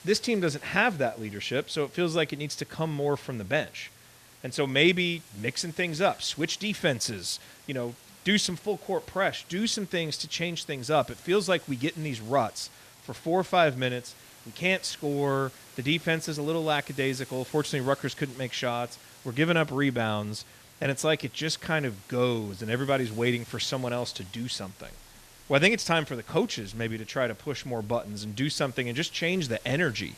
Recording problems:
hiss; faint; throughout; 20 dB below the speech

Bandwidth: 14 kHz